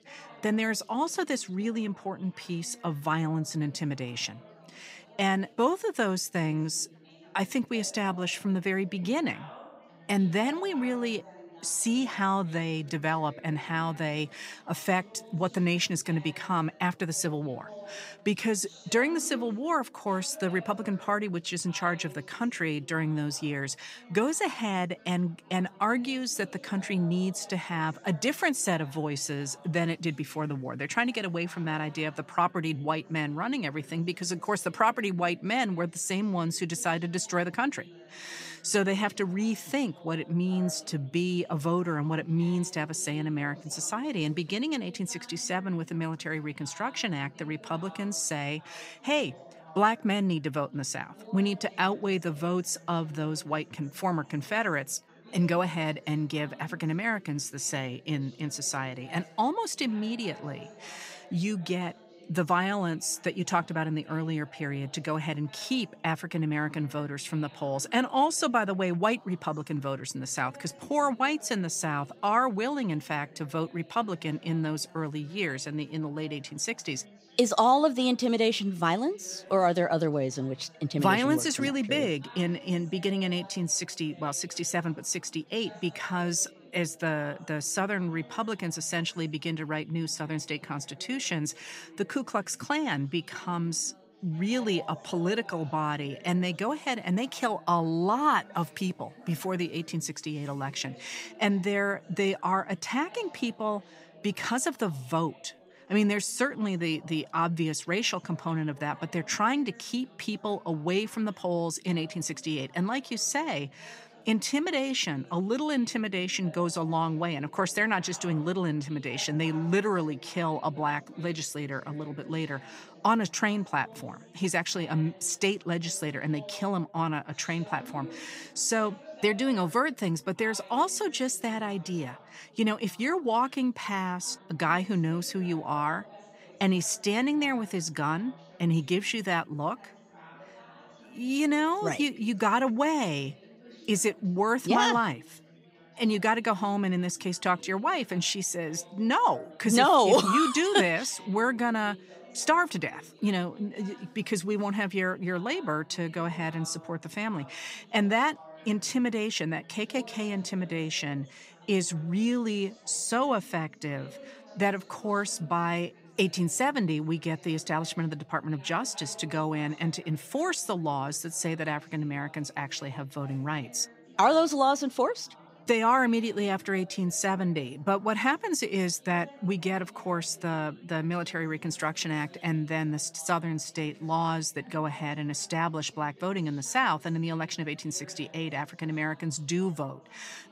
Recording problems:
chatter from many people; faint; throughout; 20 dB below the speech

